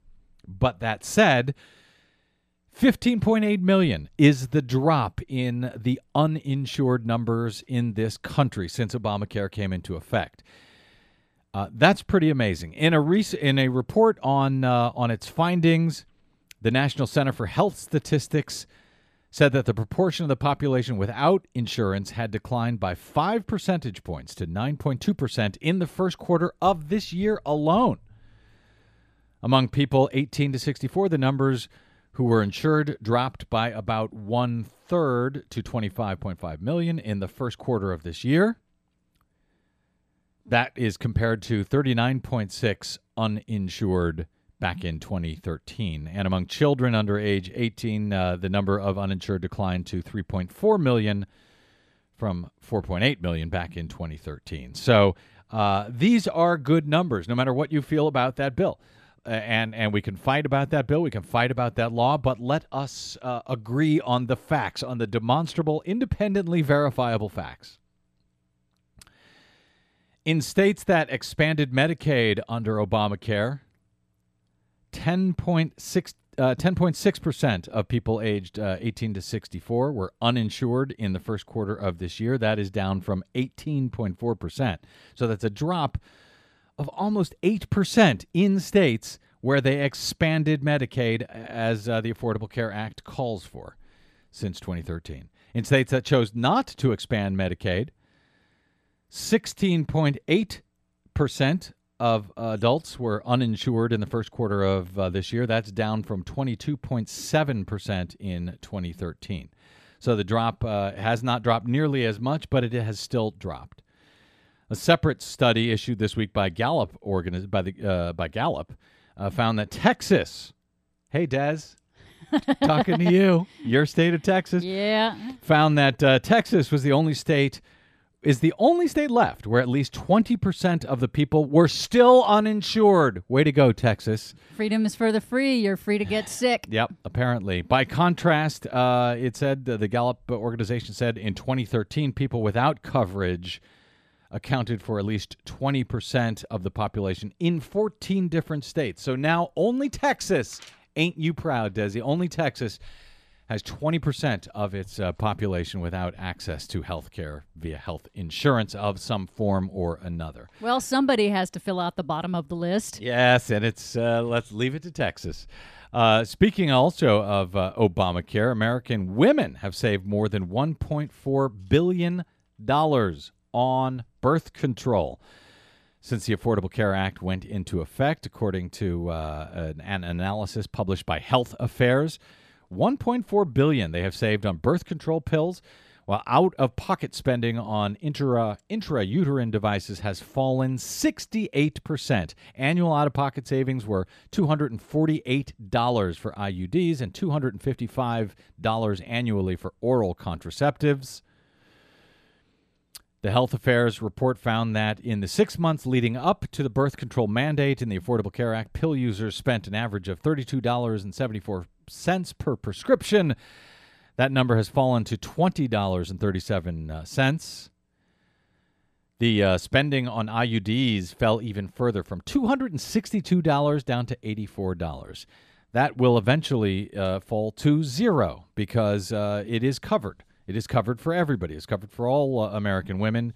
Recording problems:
none

